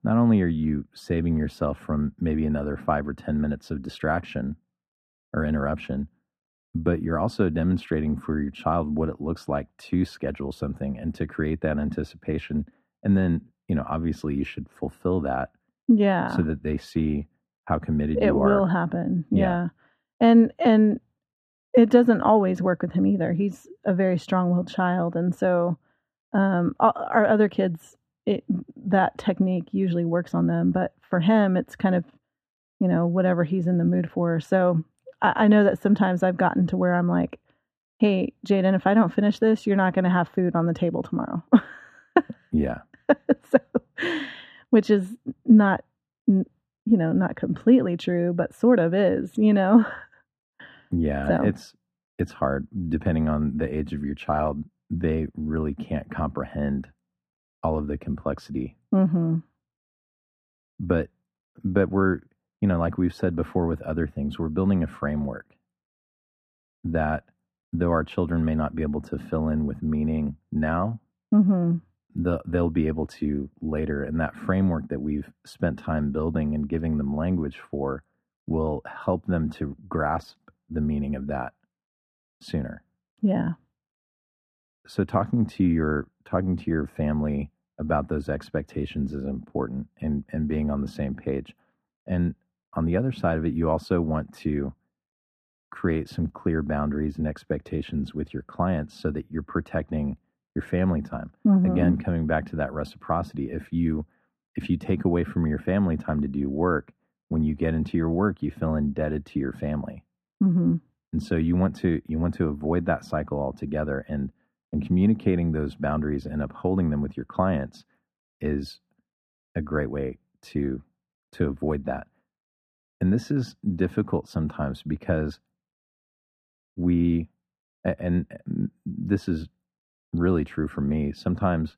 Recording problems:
muffled; very; fading above 4 kHz

